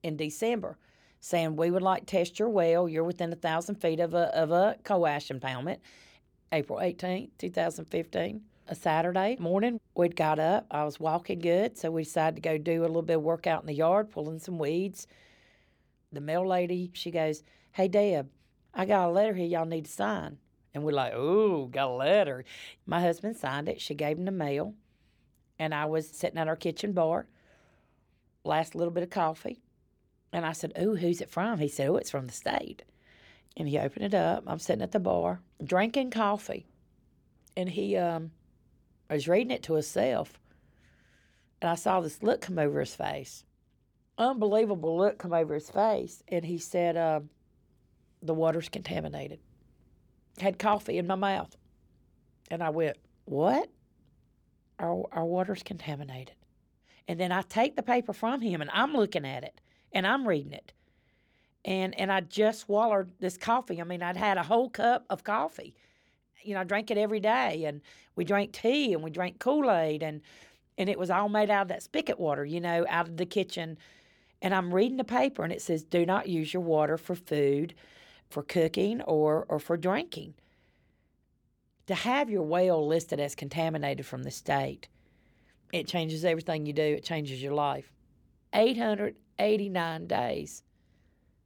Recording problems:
none

